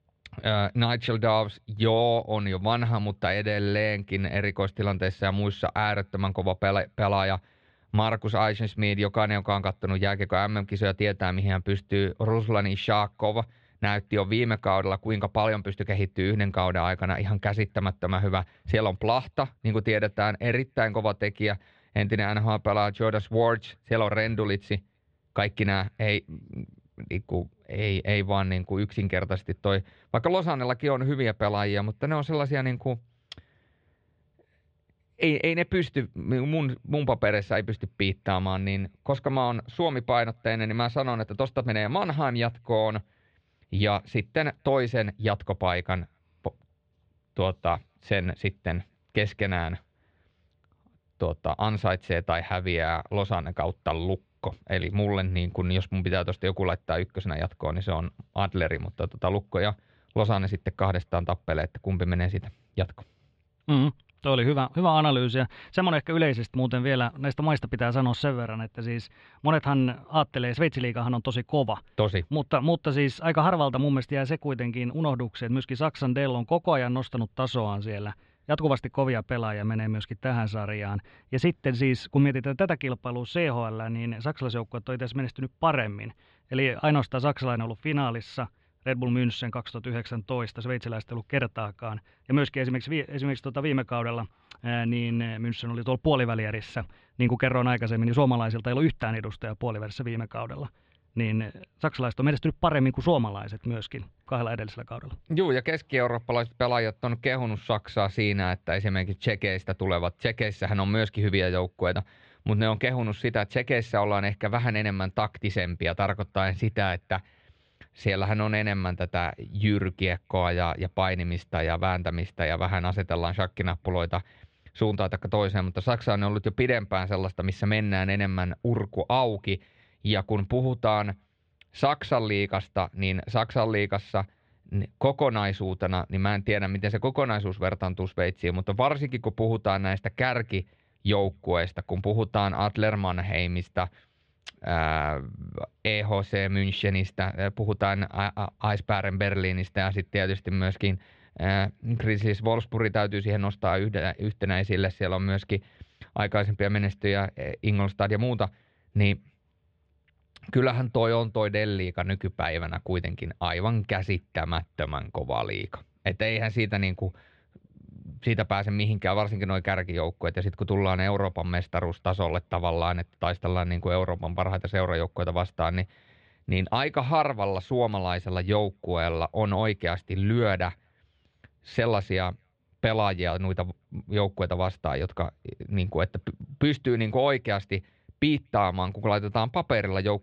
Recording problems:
muffled; slightly; fading above 3.5 kHz

